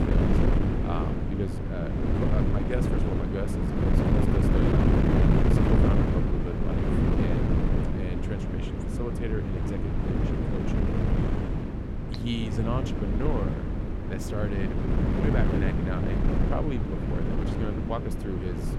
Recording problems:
wind noise on the microphone; heavy; 4 dB above the speech

